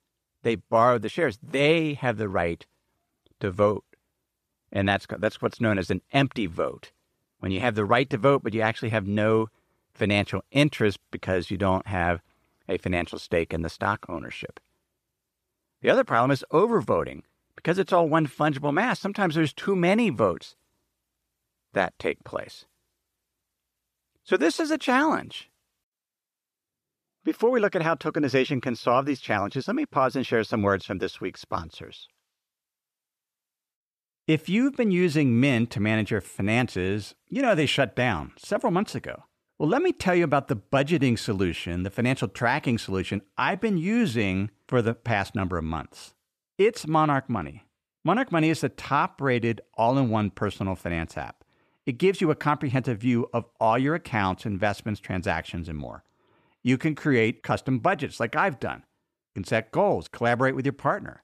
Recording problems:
none

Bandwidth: 14.5 kHz